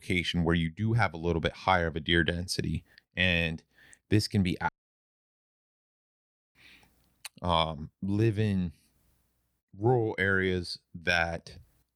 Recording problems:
audio cutting out; at 4.5 s for 2 s

